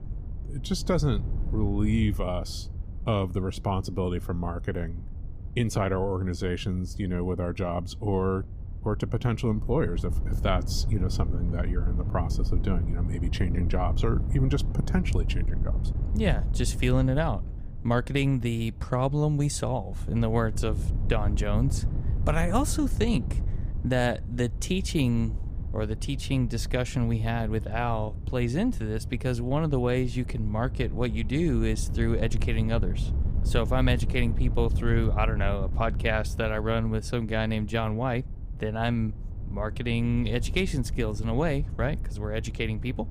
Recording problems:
wind noise on the microphone; occasional gusts; 15 dB below the speech

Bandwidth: 15 kHz